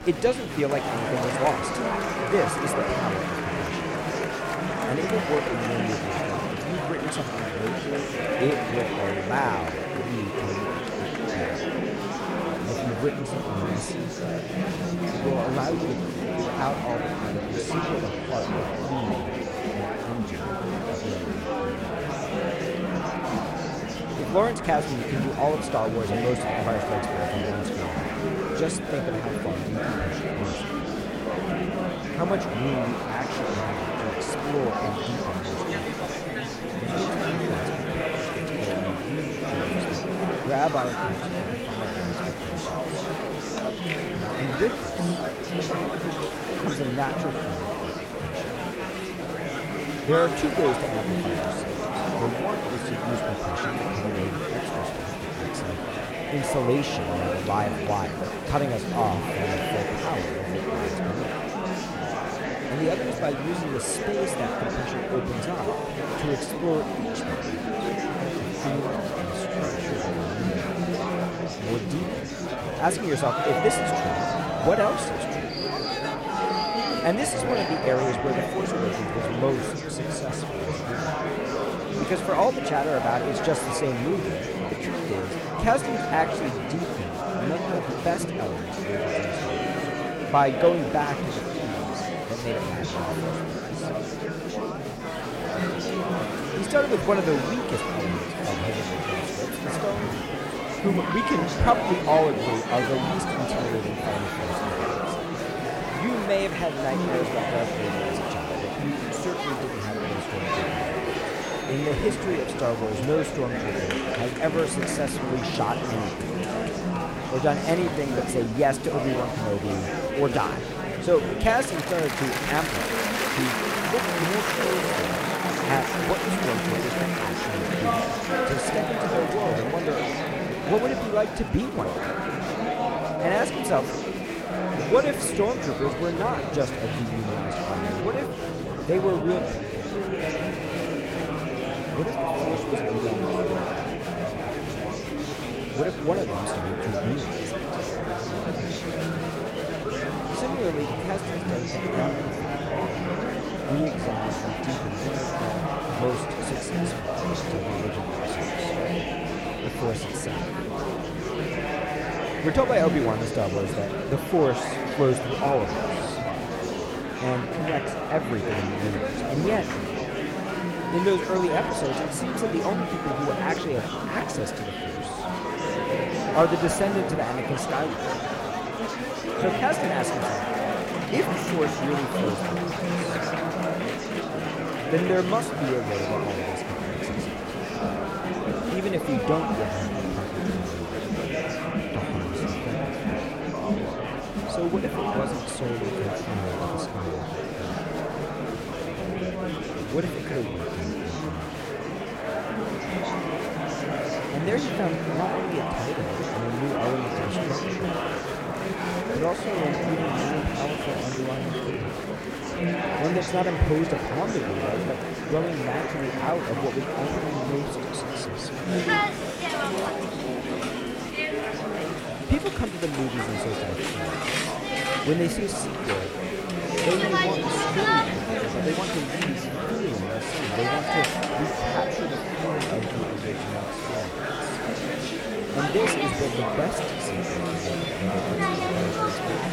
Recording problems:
murmuring crowd; very loud; throughout; 1 dB above the speech

